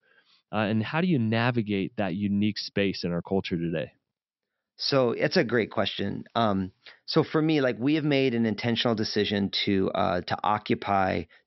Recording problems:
high frequencies cut off; noticeable; nothing above 5.5 kHz

